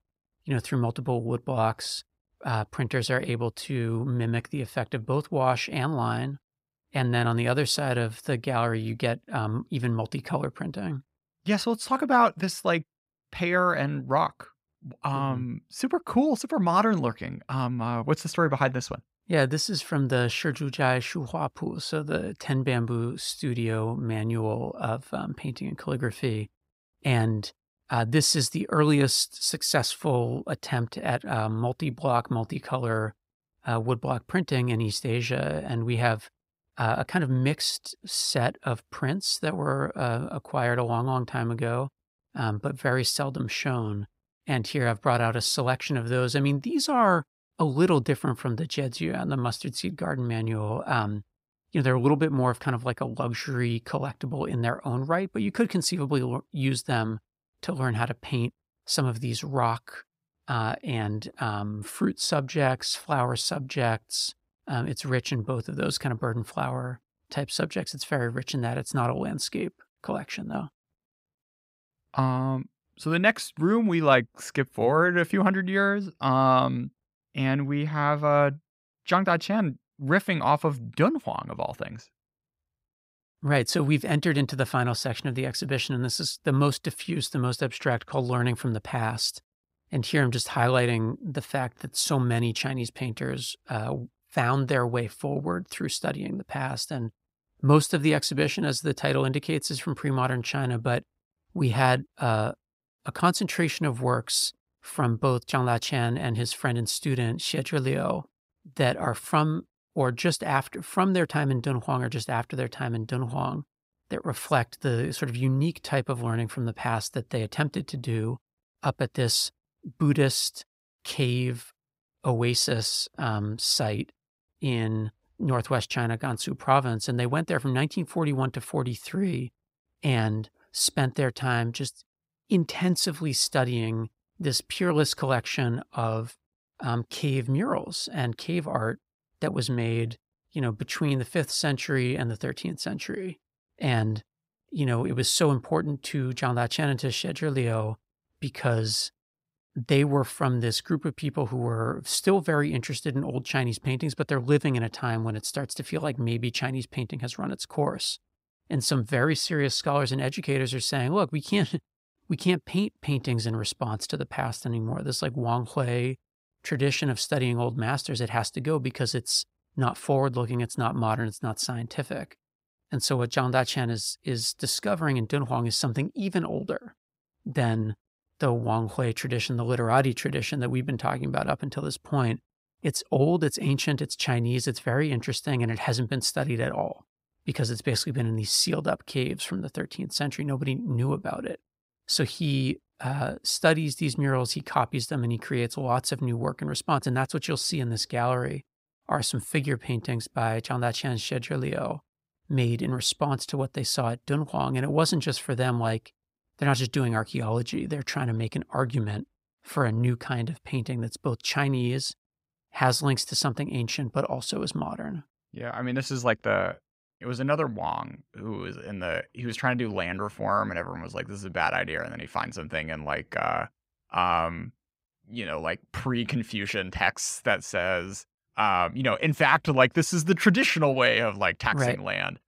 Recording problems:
none

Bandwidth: 15.5 kHz